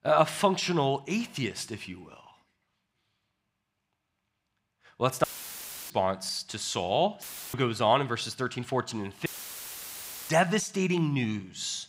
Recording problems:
audio cutting out; filled with static; at 5 s for 0.5 s, at 7 s and at 9.5 s for 1 s

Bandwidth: 15.5 kHz